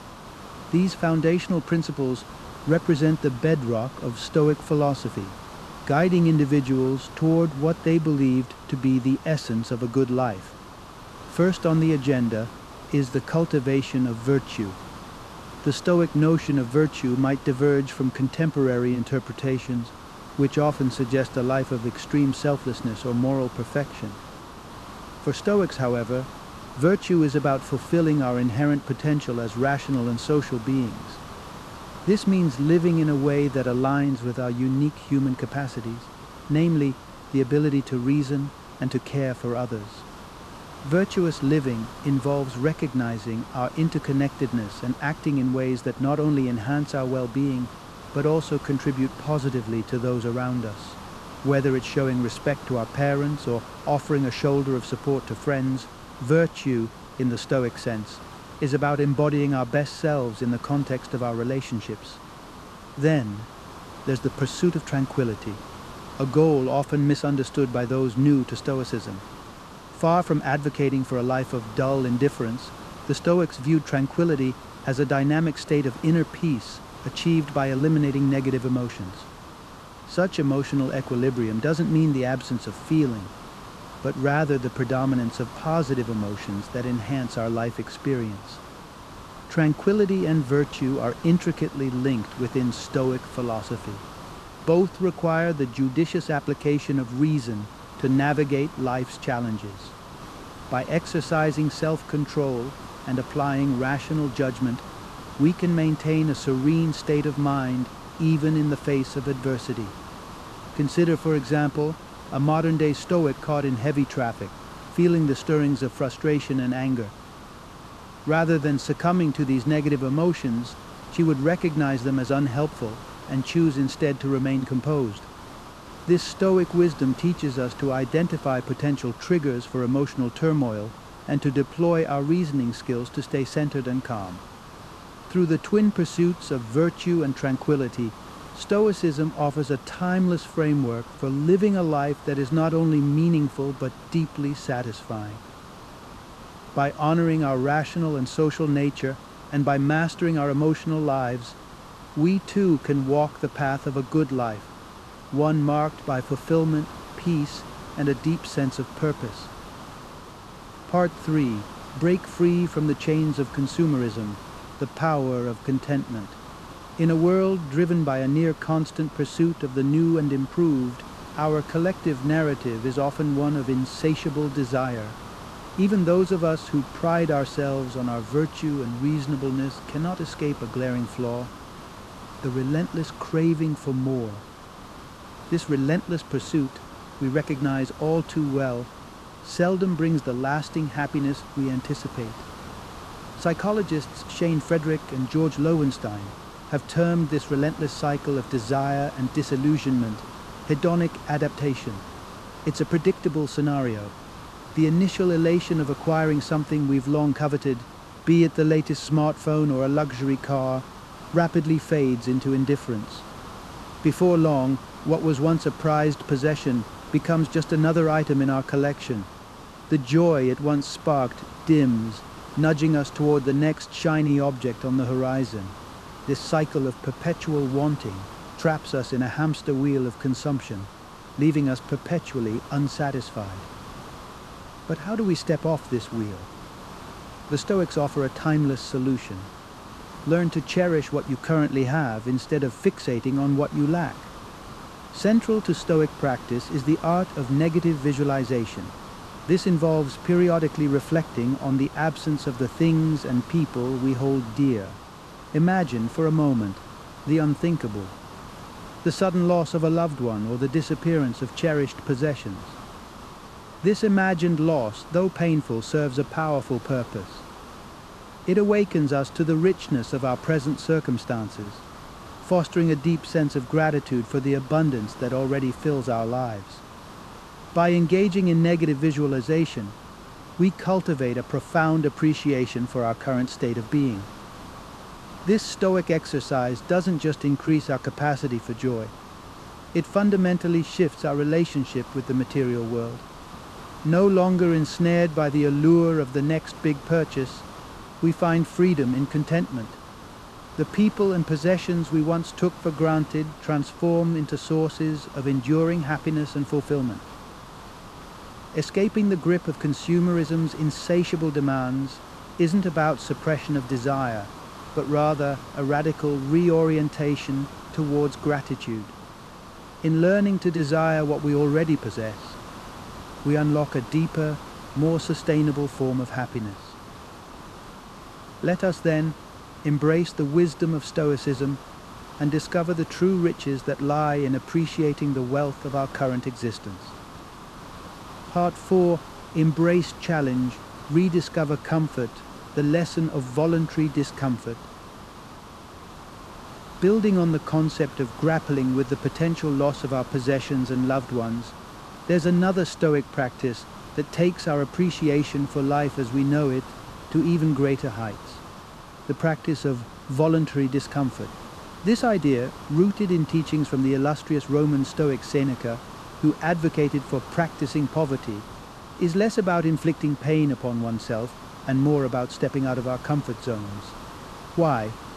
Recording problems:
hiss; noticeable; throughout; 15 dB below the speech

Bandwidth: 13.5 kHz